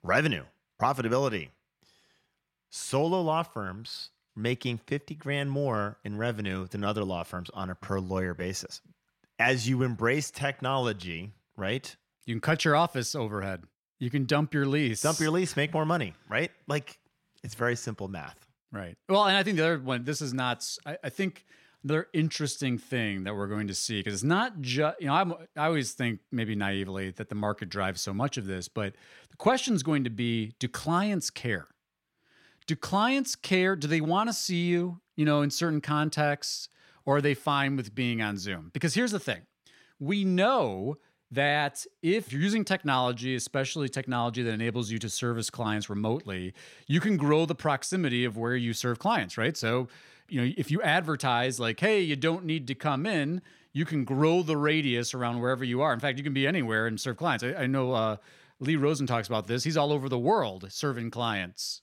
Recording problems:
none

